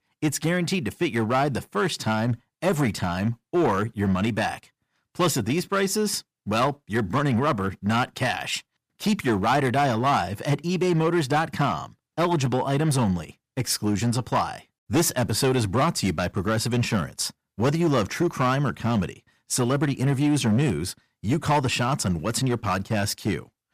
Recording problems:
distortion; slight; 6% of the sound clipped

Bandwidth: 15 kHz